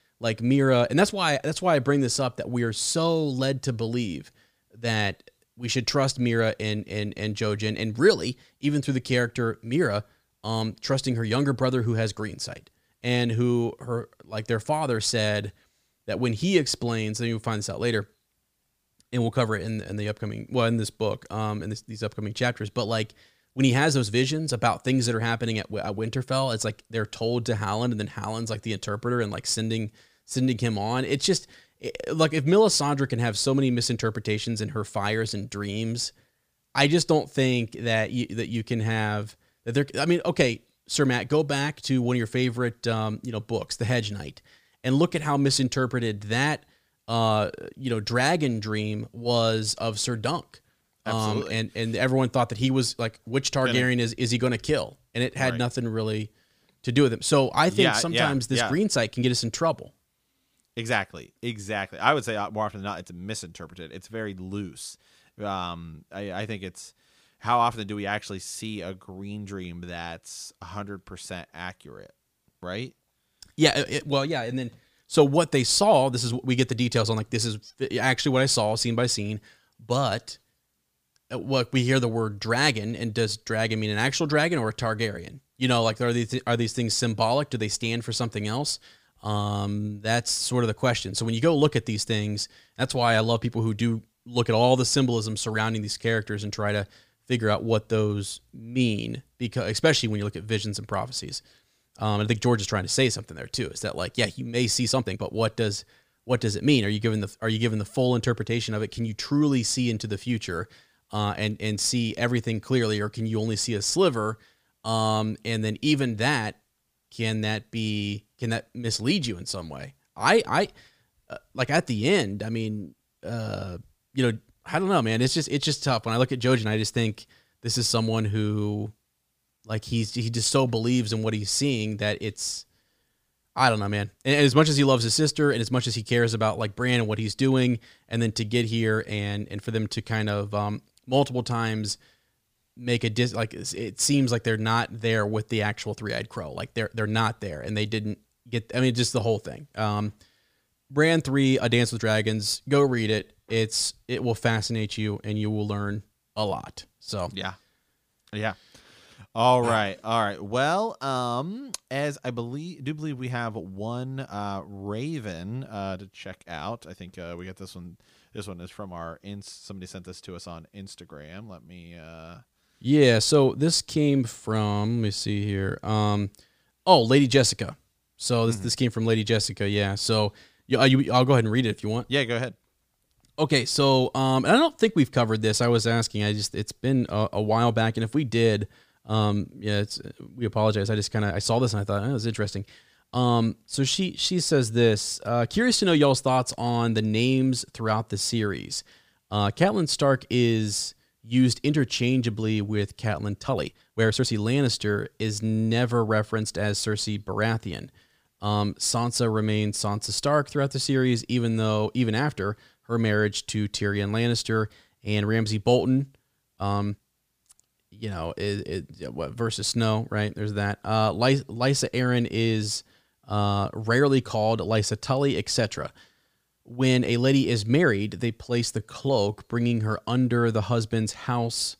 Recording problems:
uneven, jittery; strongly; from 24 s to 3:50

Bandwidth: 15 kHz